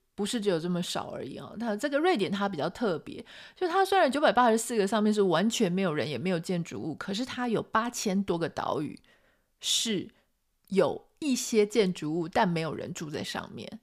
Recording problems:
none

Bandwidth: 15 kHz